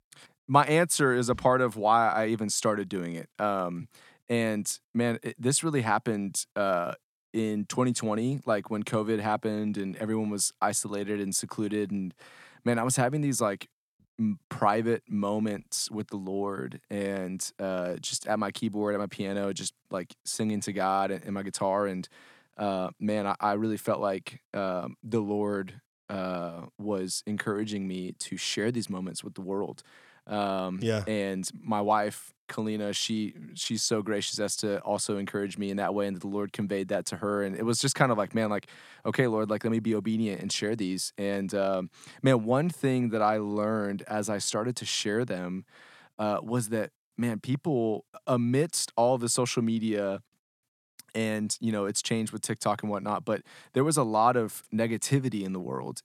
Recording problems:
none

